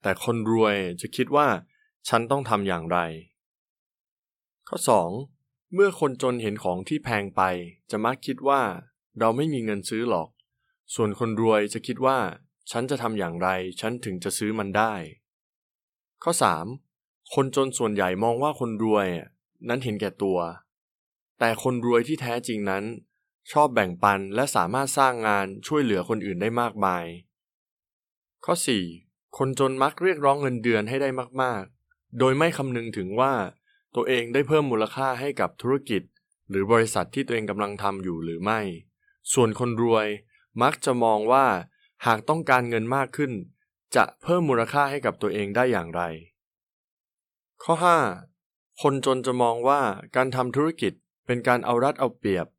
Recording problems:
none

